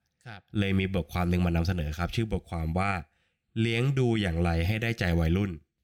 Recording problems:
none

